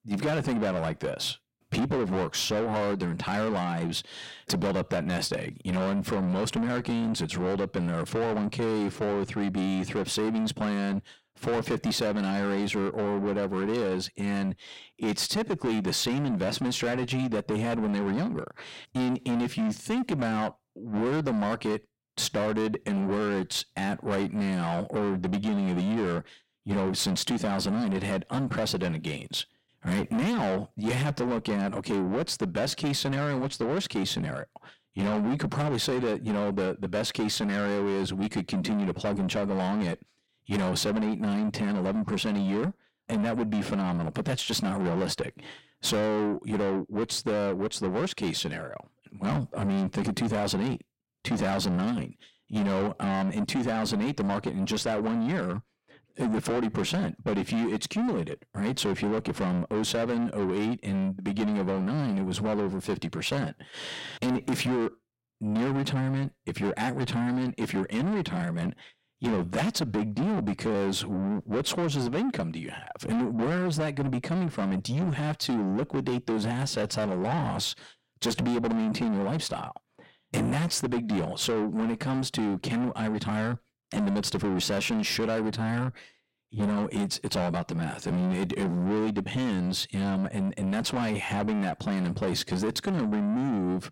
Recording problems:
distortion; heavy; 6 dB below the speech

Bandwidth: 16 kHz